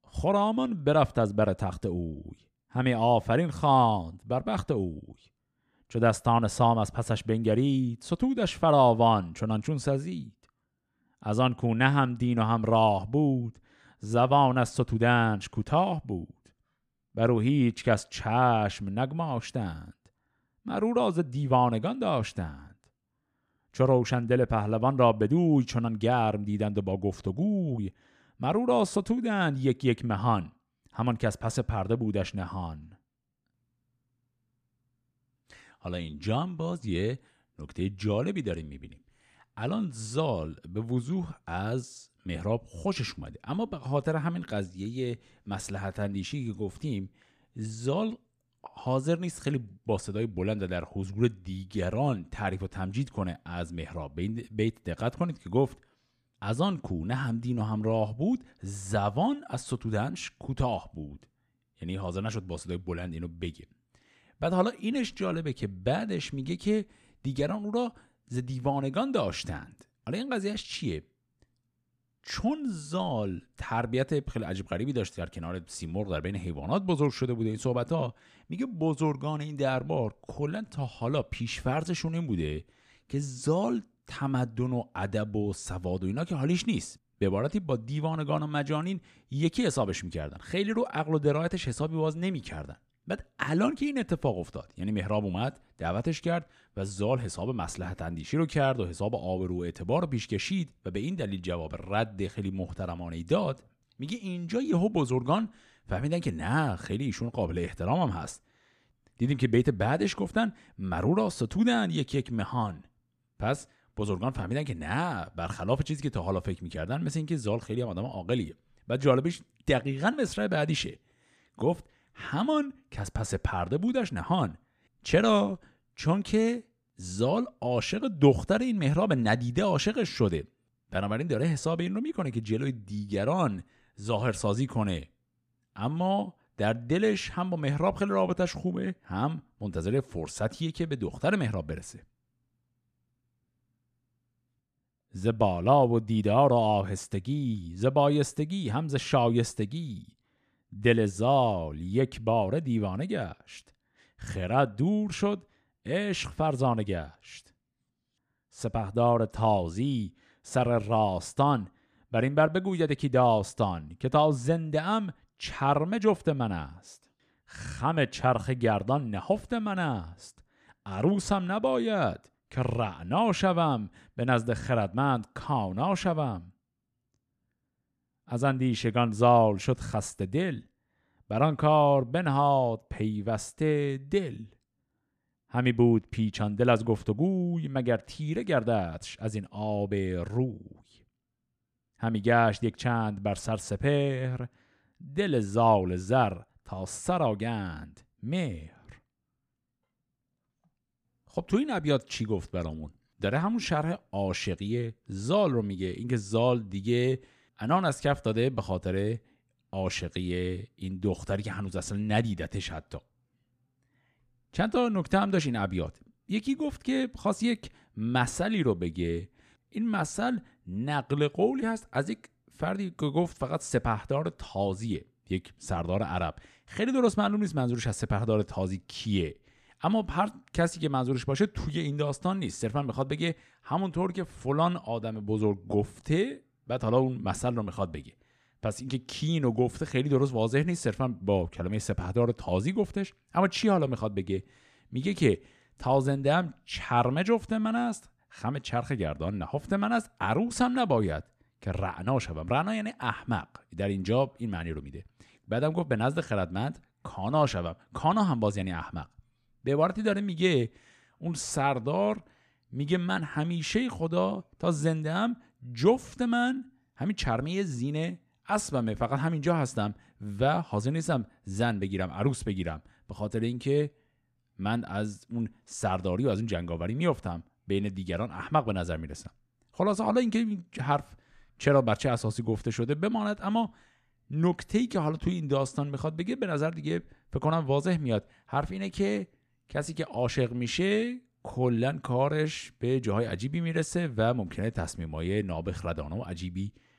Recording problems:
none

